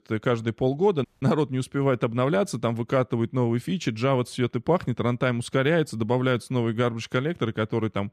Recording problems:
audio cutting out; at 1 s

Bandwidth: 14.5 kHz